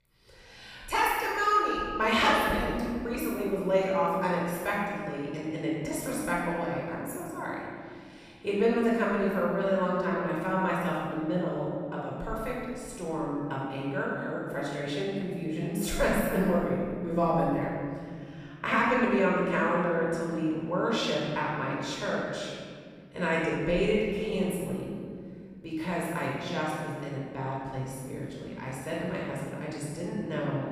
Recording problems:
room echo; strong; dies away in 2.1 s
off-mic speech; far

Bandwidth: 15 kHz